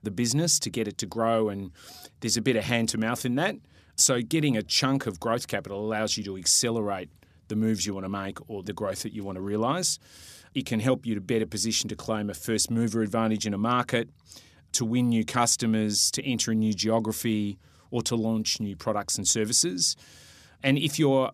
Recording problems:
none

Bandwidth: 14.5 kHz